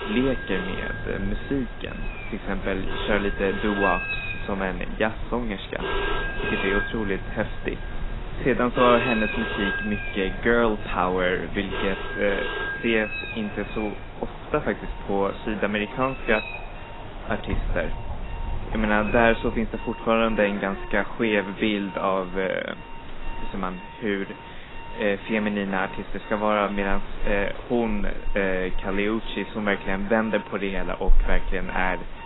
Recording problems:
garbled, watery; badly; nothing above 4 kHz
alarms or sirens; loud; throughout; 8 dB below the speech
animal sounds; loud; throughout; 10 dB below the speech
wind noise on the microphone; occasional gusts; 20 dB below the speech

